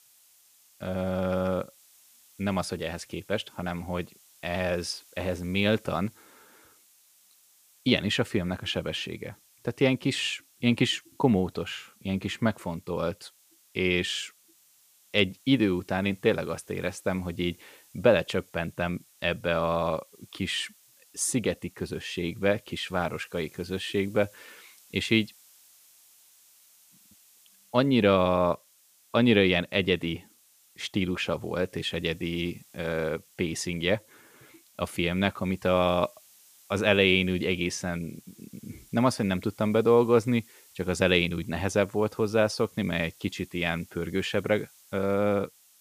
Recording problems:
hiss; faint; throughout; 30 dB below the speech

